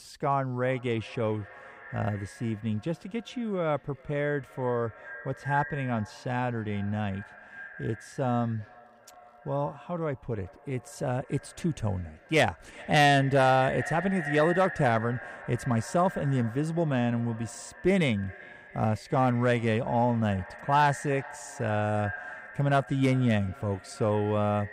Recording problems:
echo of what is said; noticeable; throughout; 390 ms later, 15 dB below the speech

